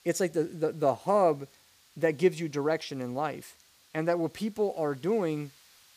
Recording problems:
hiss; faint; throughout; 30 dB below the speech

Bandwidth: 15 kHz